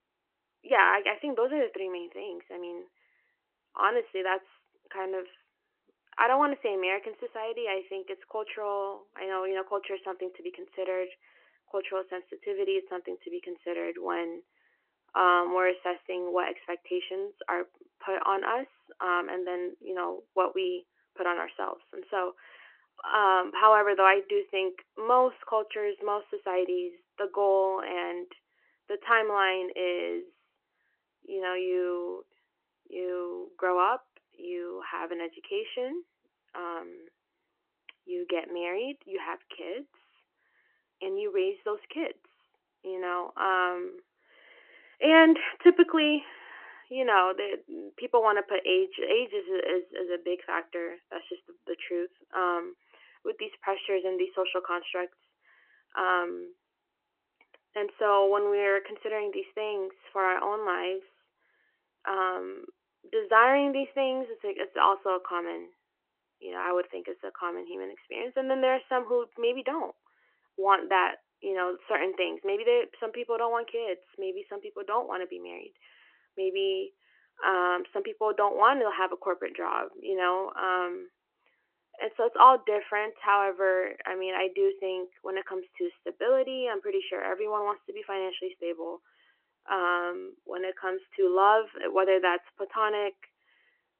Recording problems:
phone-call audio; nothing above 3 kHz

